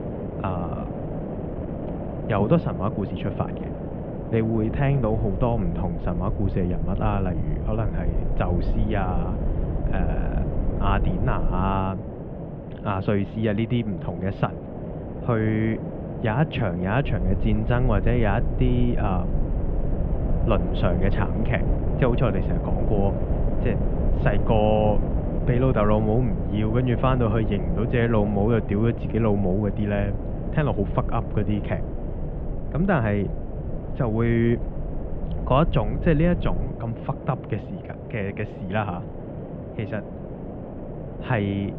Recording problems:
muffled; very; fading above 3 kHz
wind noise on the microphone; heavy; 8 dB below the speech
low rumble; noticeable; from 4.5 to 12 s and from 17 to 37 s; 20 dB below the speech

